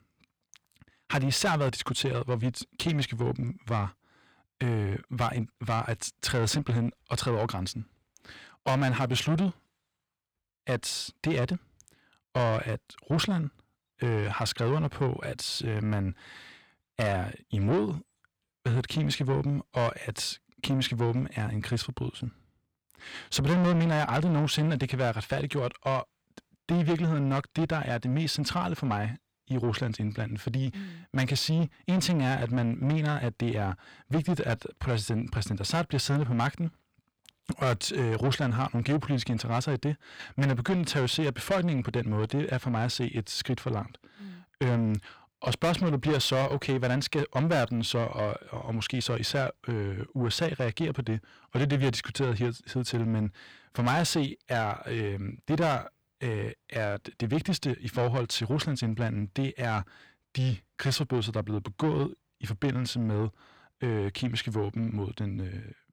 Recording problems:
distortion; heavy; 8 dB below the speech

